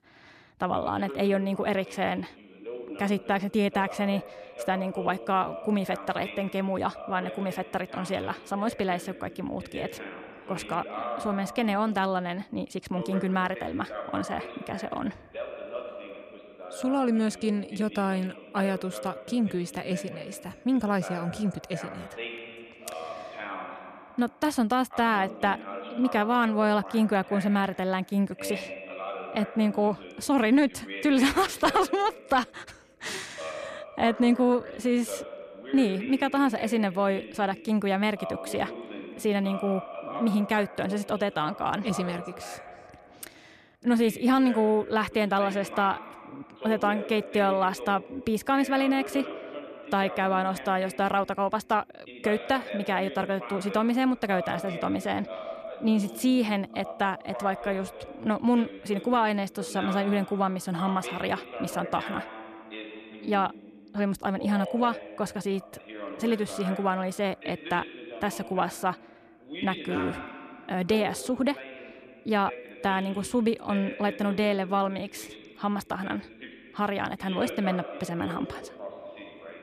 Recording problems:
voice in the background; noticeable; throughout; 10 dB below the speech

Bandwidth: 14.5 kHz